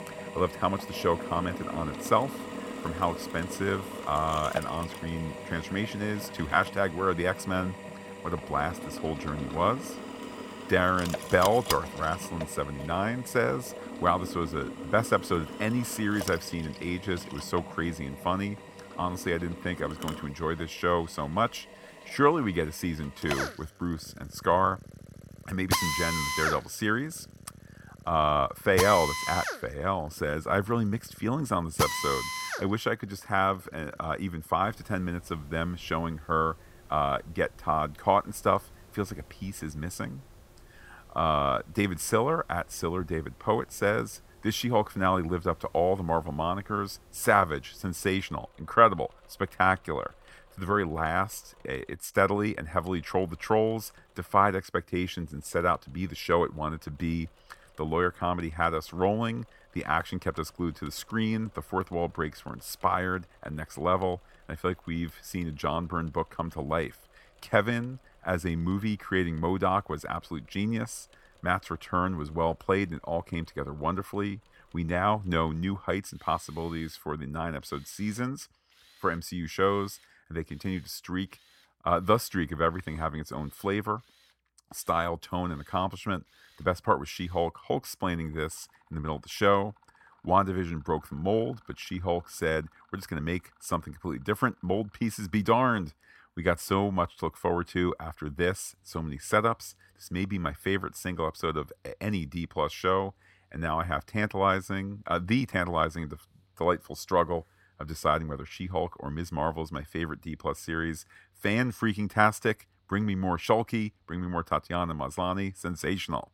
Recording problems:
machinery noise; loud; throughout; 8 dB below the speech

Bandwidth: 16.5 kHz